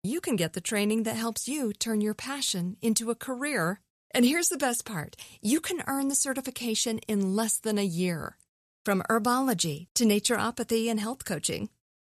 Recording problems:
none

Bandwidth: 14 kHz